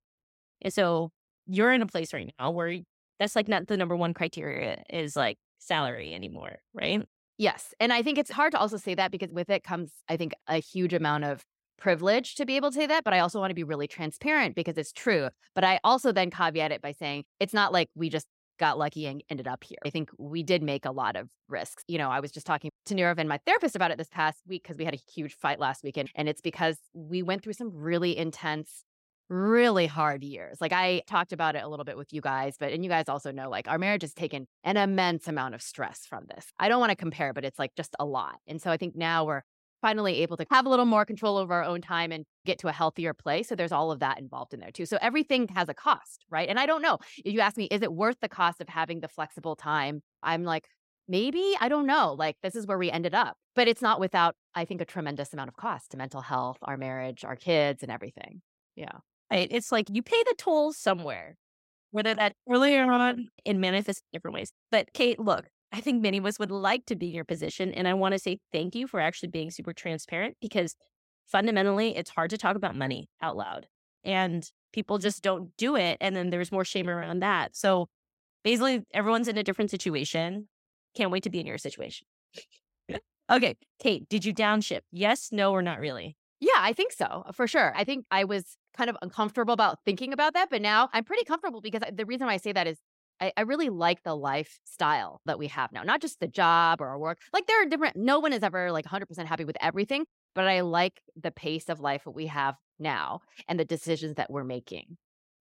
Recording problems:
none

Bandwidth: 16 kHz